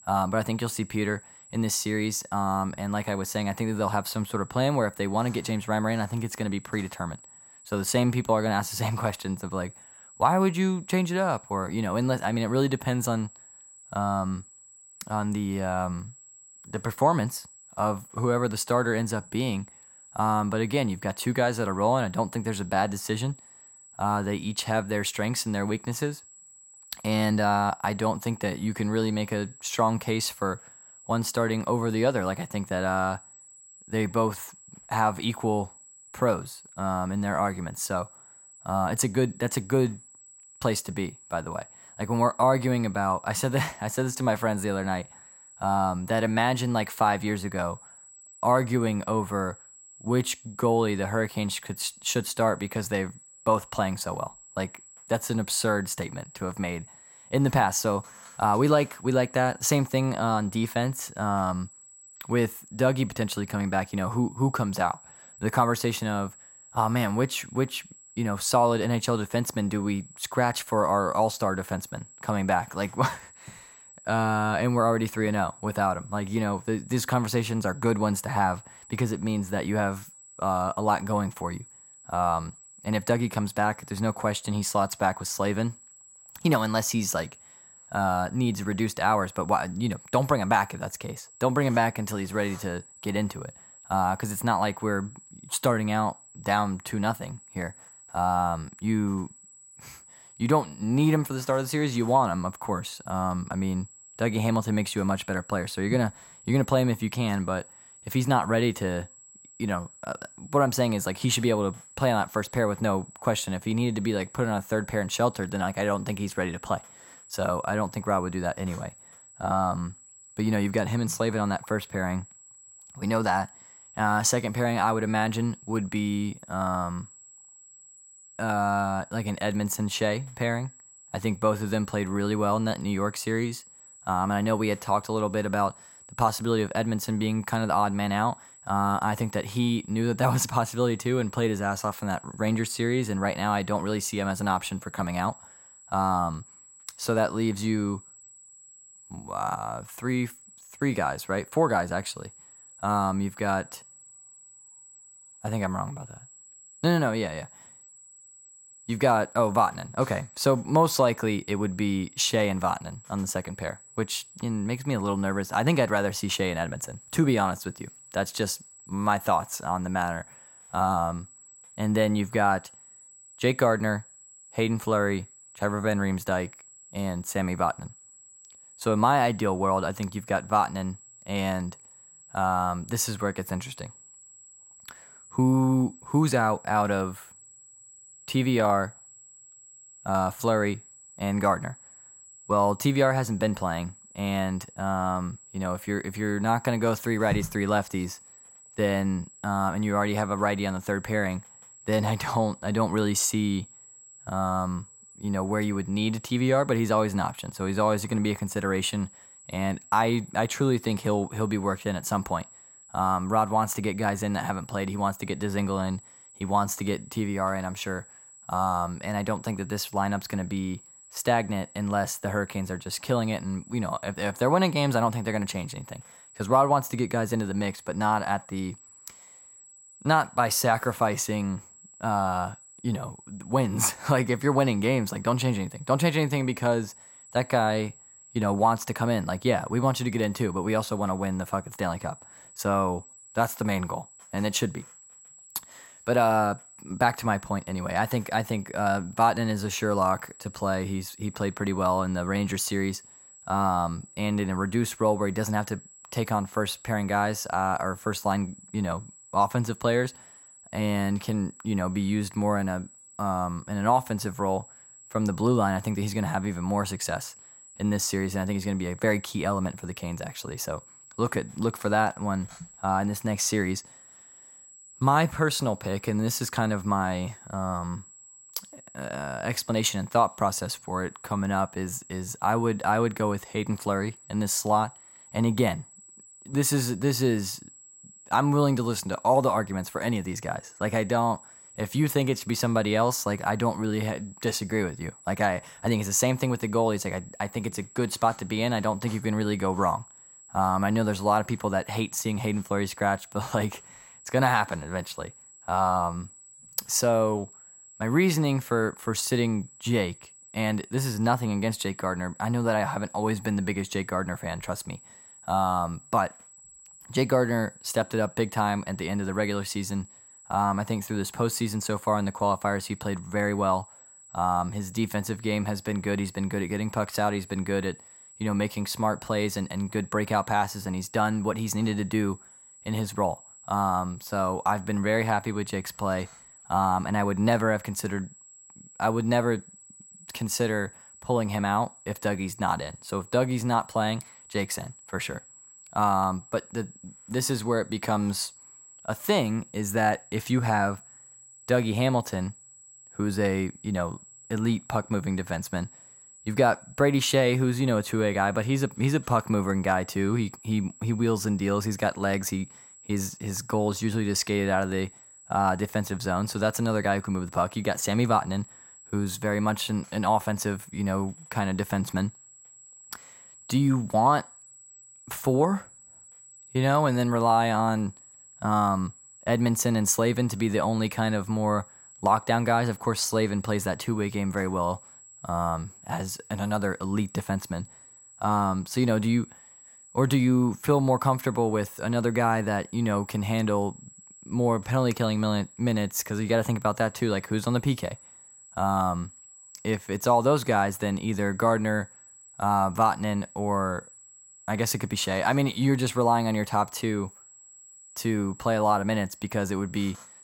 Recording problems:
high-pitched whine; faint; throughout; 8 kHz, 20 dB below the speech

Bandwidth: 16 kHz